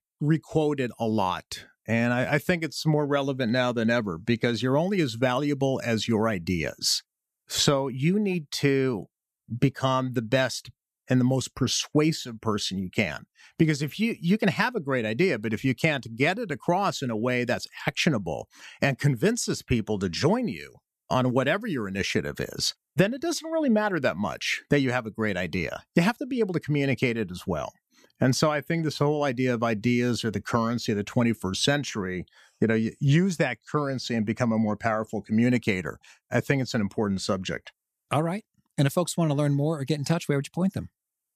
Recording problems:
none

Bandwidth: 14.5 kHz